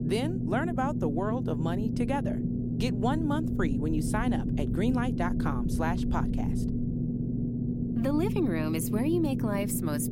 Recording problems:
low rumble; loud; throughout; 5 dB below the speech

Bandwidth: 16 kHz